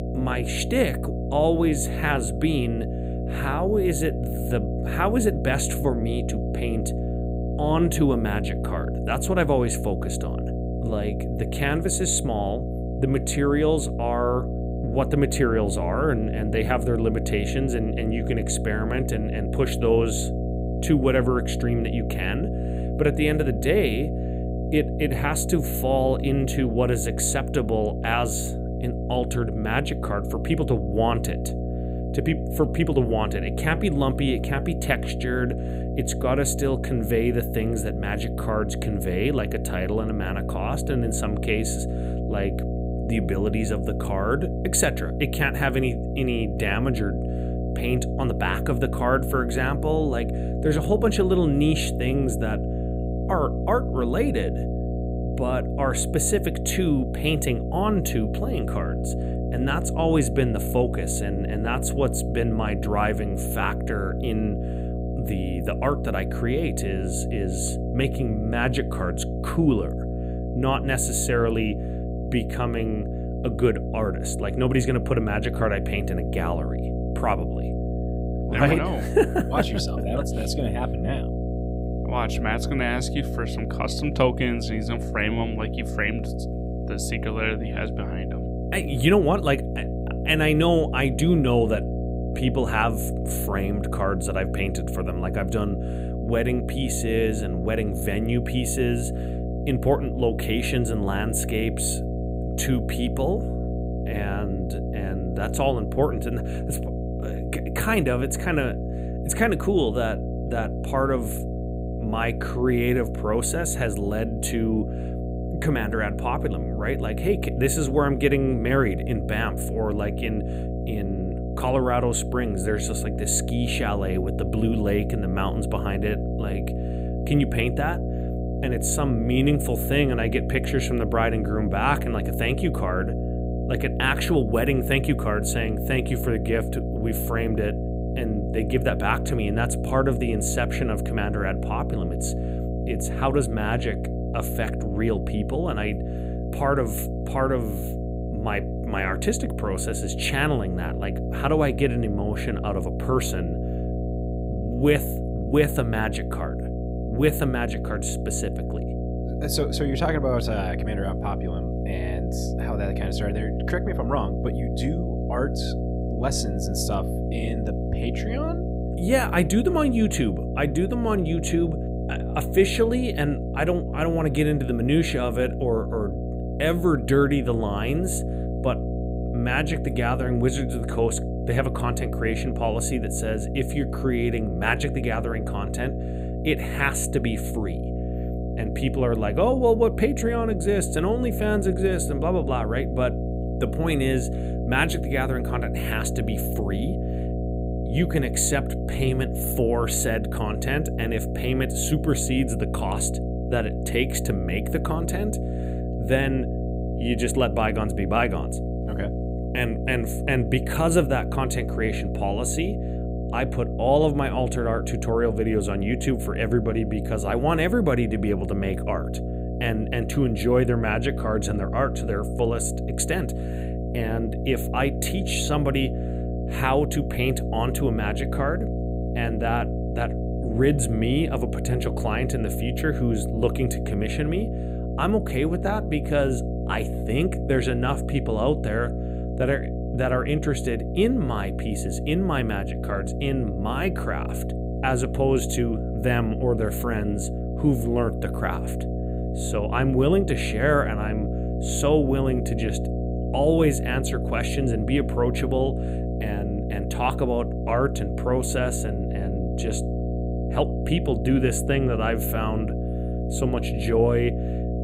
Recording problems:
electrical hum; loud; throughout; 60 Hz, 8 dB below the speech

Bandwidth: 15.5 kHz